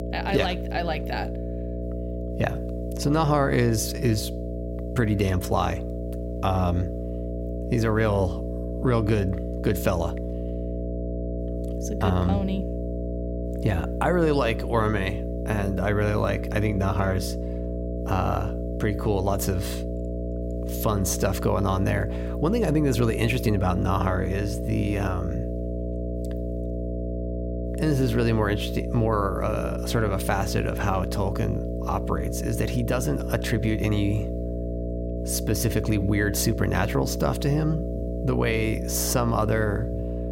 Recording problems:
electrical hum; loud; throughout; 60 Hz, 7 dB below the speech

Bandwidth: 16 kHz